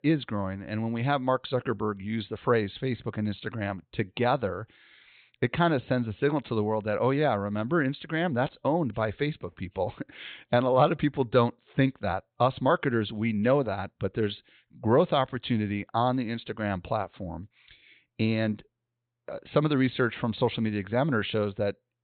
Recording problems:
high frequencies cut off; severe; nothing above 4 kHz

